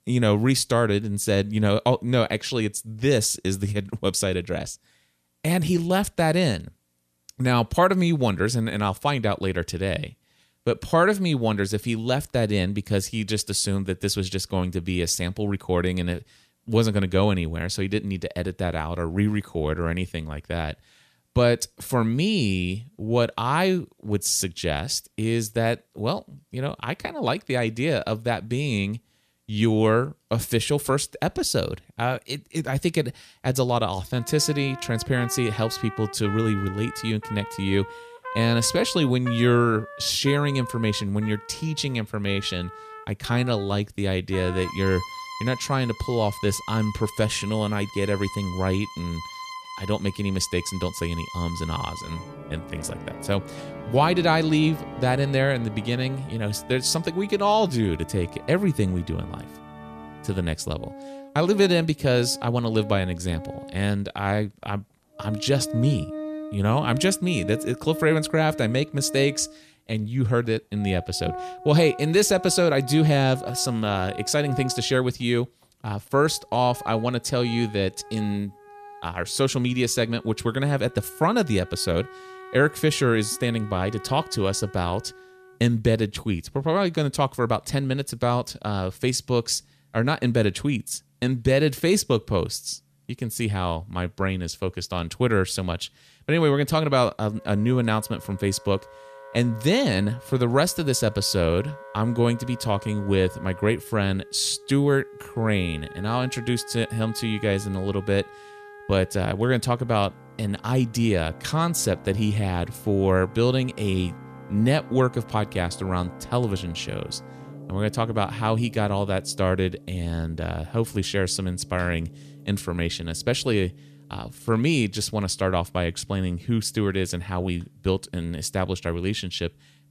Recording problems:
background music; noticeable; from 34 s on; 15 dB below the speech

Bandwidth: 14.5 kHz